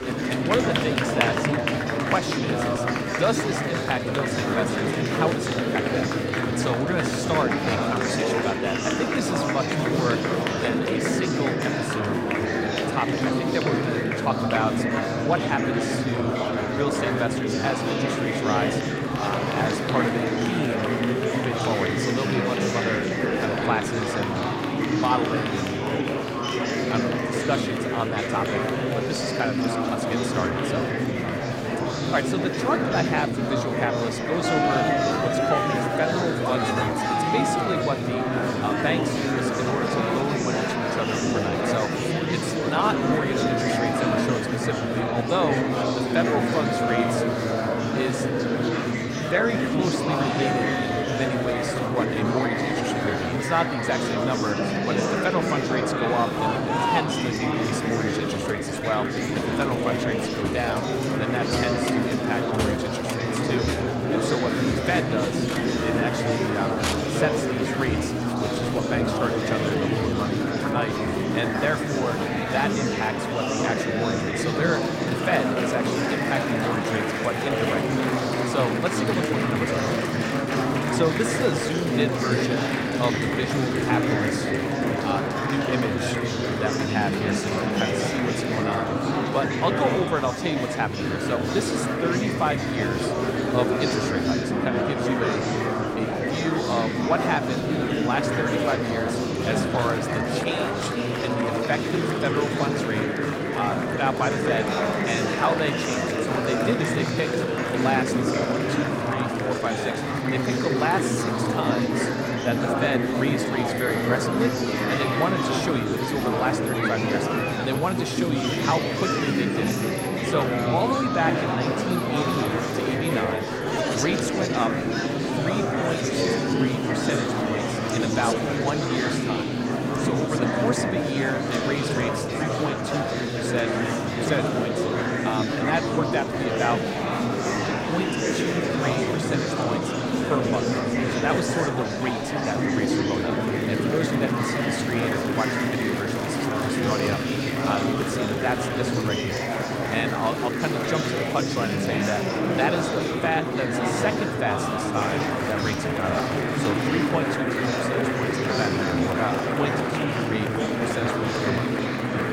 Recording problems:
murmuring crowd; very loud; throughout; 4 dB above the speech

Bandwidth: 16 kHz